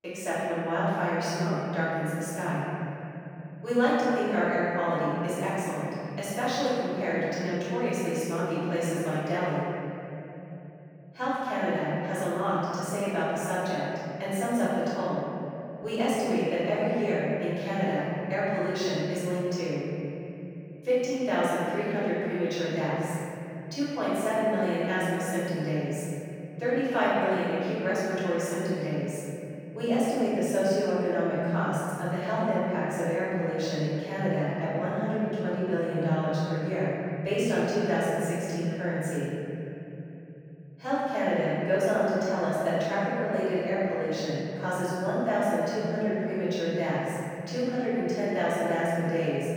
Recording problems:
room echo; strong; dies away in 3 s
off-mic speech; far

